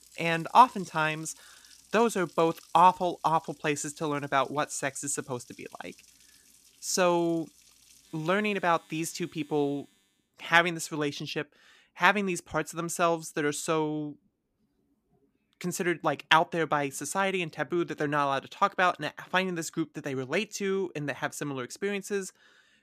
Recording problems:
household noises; faint; until 10 s; 25 dB below the speech

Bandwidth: 14.5 kHz